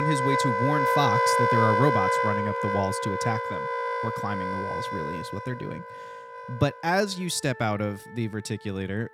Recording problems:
background music; very loud; throughout; 3 dB above the speech
abrupt cut into speech; at the start

